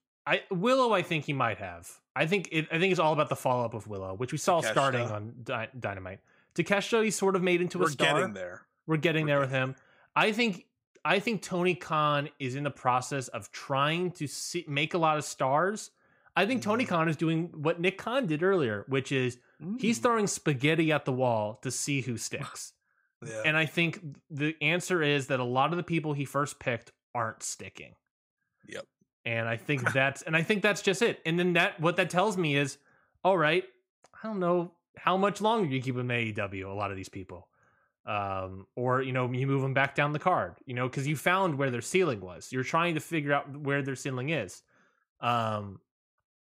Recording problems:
none

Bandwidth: 15.5 kHz